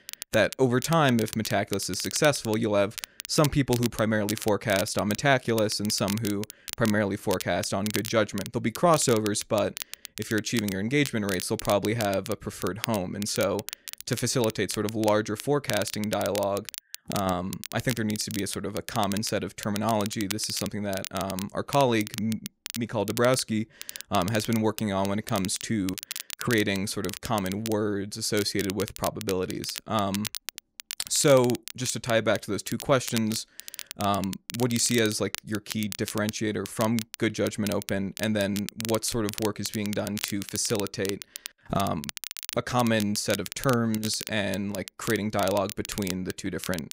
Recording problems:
crackle, like an old record; noticeable; 10 dB below the speech

